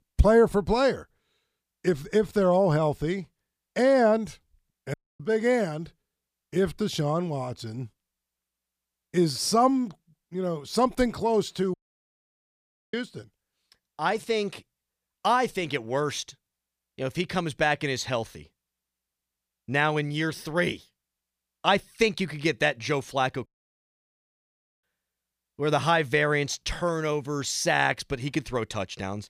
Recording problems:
audio cutting out; at 5 s, at 12 s for 1 s and at 23 s for 1.5 s

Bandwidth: 15 kHz